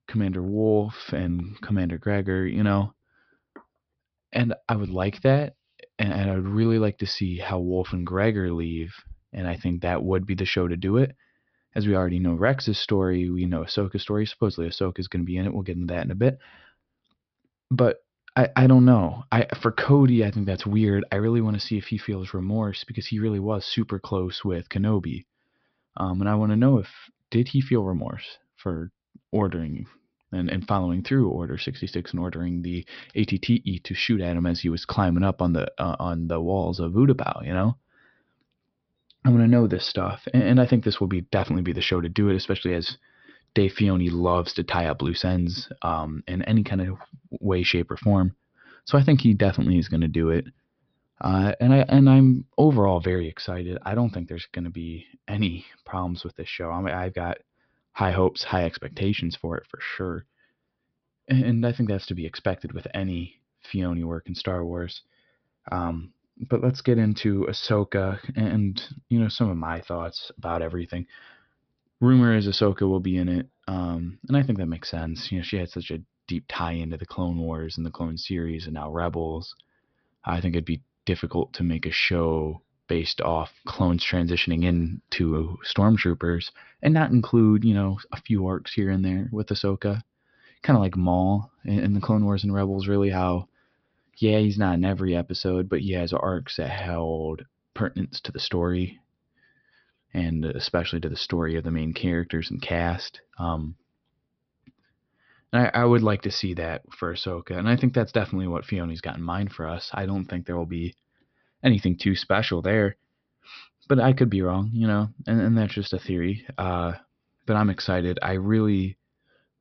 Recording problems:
high frequencies cut off; noticeable; nothing above 5.5 kHz

